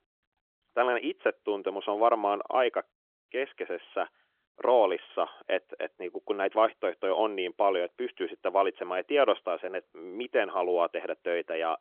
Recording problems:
phone-call audio; nothing above 3.5 kHz

